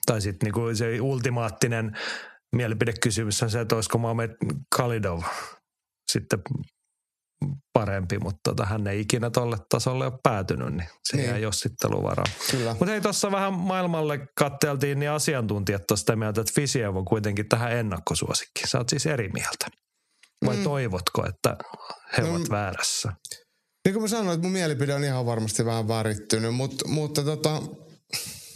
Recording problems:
squashed, flat; heavily

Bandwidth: 13.5 kHz